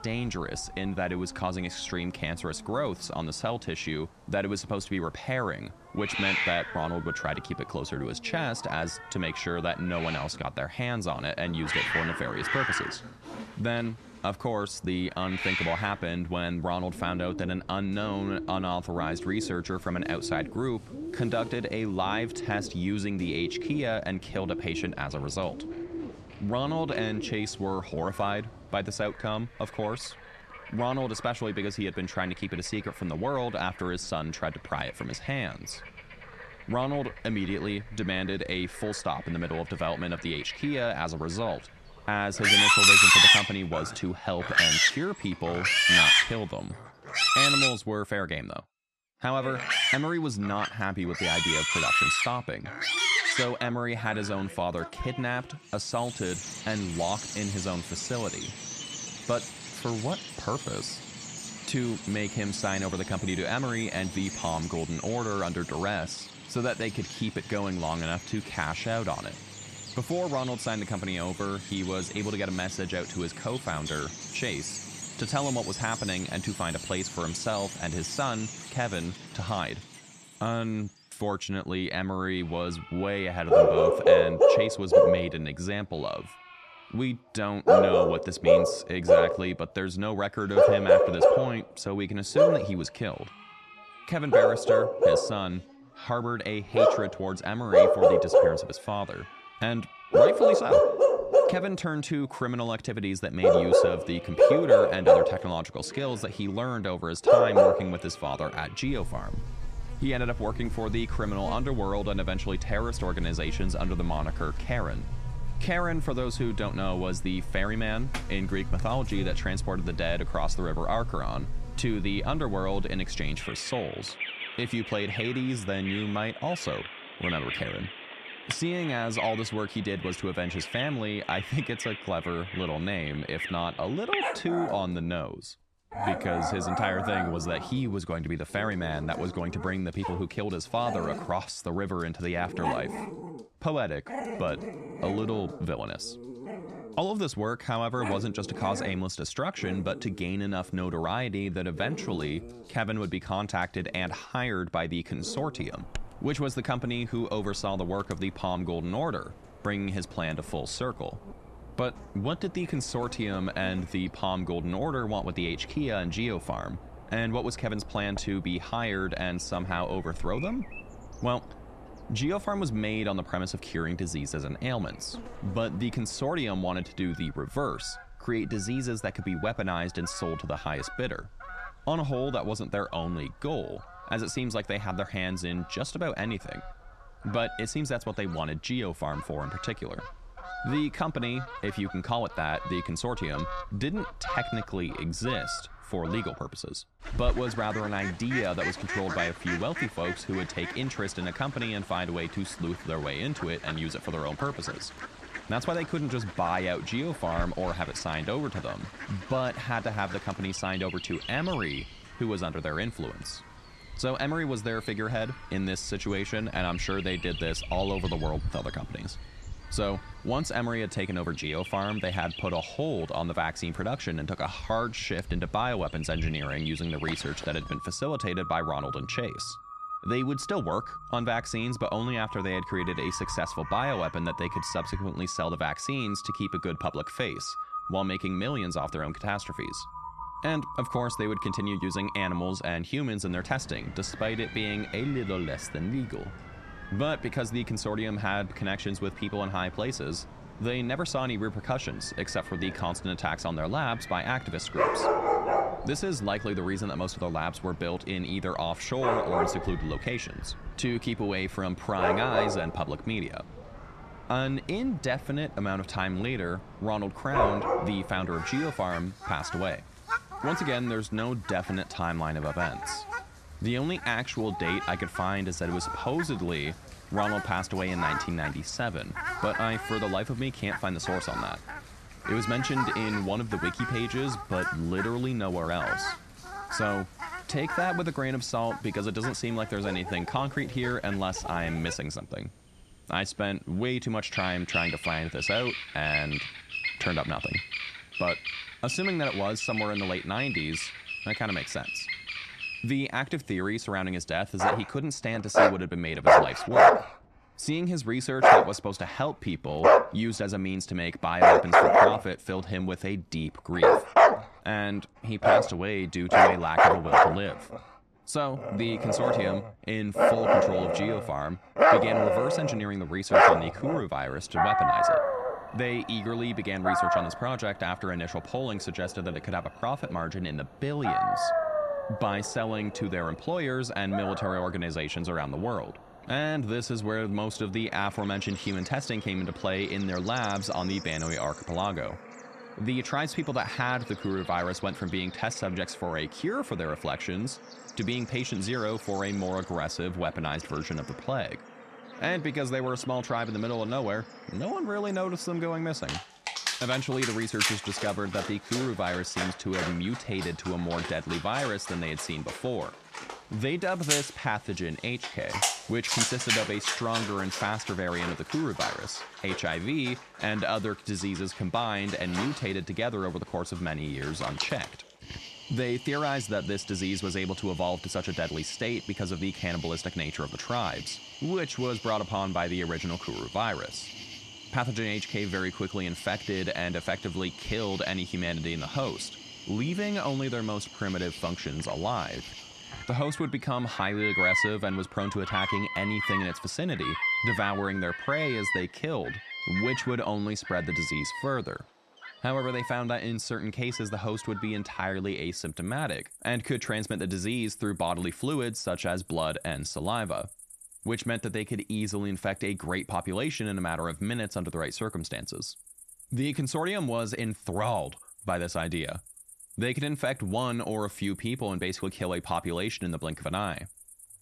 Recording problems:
animal sounds; very loud; throughout; 4 dB above the speech

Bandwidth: 13.5 kHz